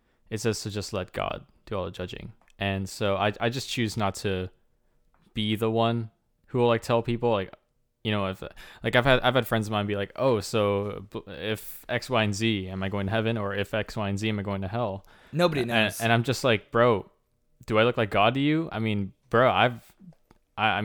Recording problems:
abrupt cut into speech; at the end

